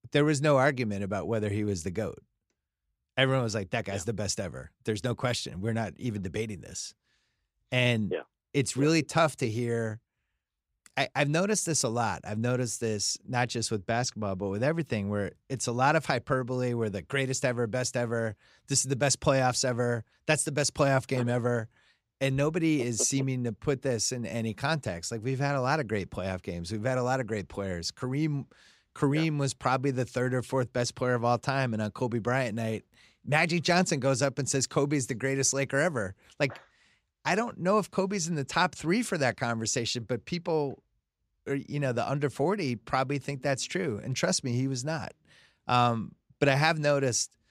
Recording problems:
none

